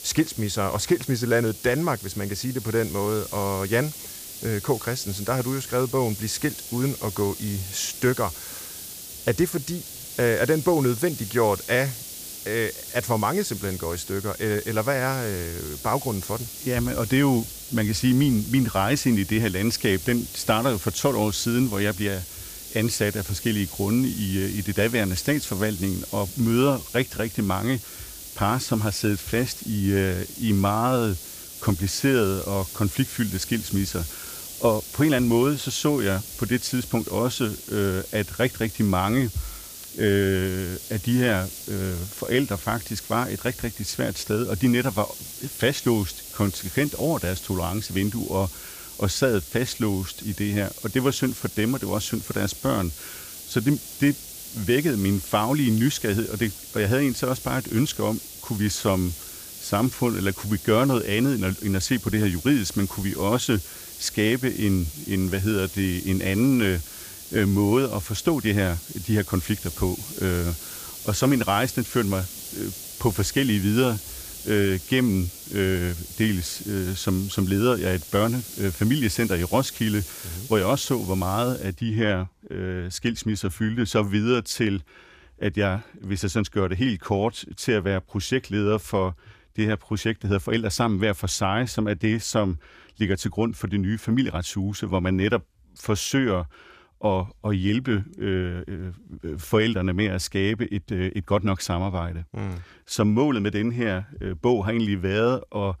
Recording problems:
hiss; noticeable; until 1:22; 10 dB below the speech

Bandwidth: 15 kHz